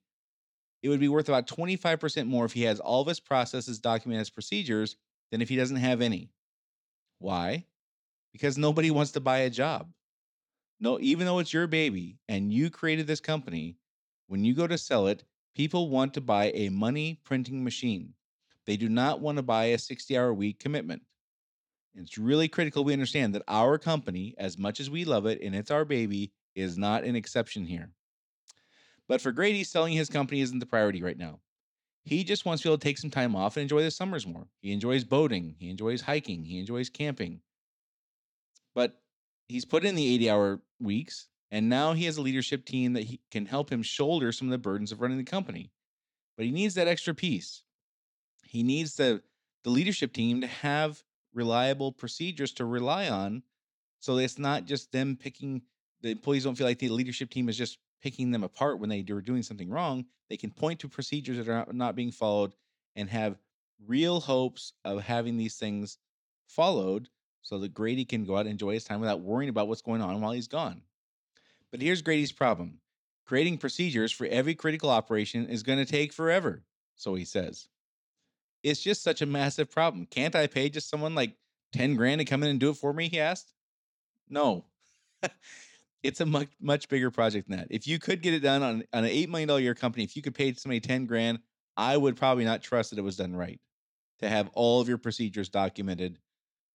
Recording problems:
none

